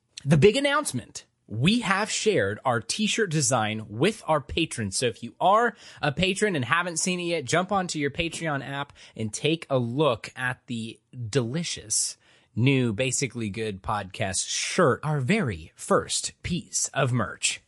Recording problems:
garbled, watery; slightly; nothing above 11 kHz

